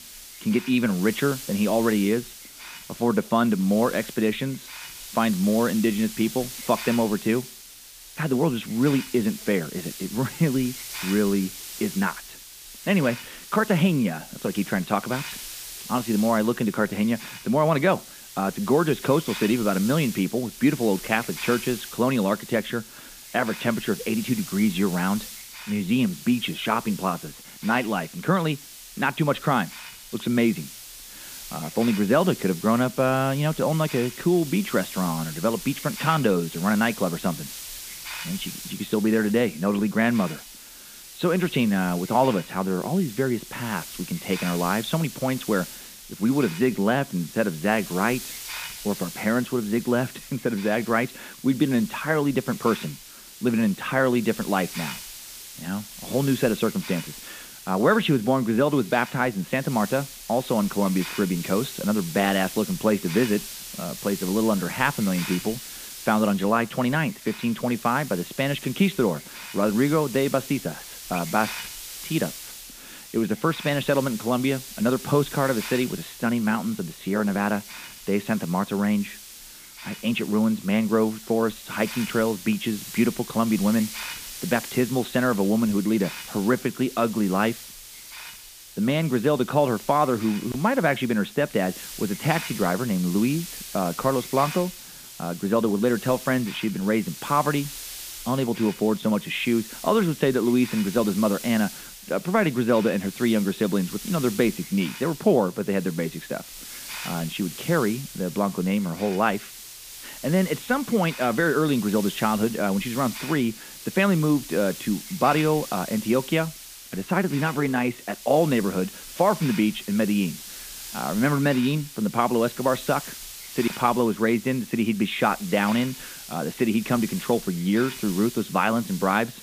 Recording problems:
high frequencies cut off; severe; nothing above 4 kHz
hiss; noticeable; throughout; 10 dB below the speech

